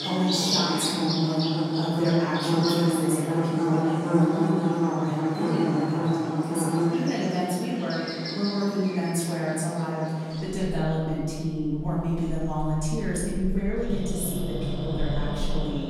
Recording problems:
room echo; strong; dies away in 1.6 s
off-mic speech; far
animal sounds; very loud; throughout; 1 dB above the speech

